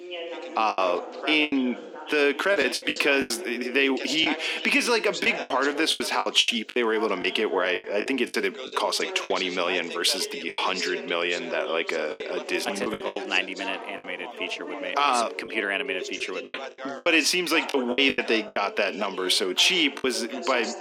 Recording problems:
thin; somewhat; fading below 250 Hz
background chatter; noticeable; throughout; 2 voices, 10 dB below the speech
choppy; very; 10% of the speech affected

